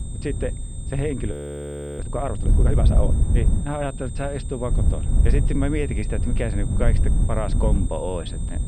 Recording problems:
muffled; very; fading above 3 kHz
wind noise on the microphone; heavy; 8 dB below the speech
high-pitched whine; noticeable; throughout; 8.5 kHz, 15 dB below the speech
audio freezing; at 1.5 s for 0.5 s

